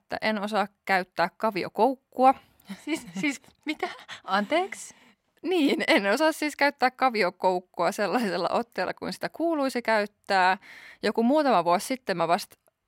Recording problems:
none

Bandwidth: 16 kHz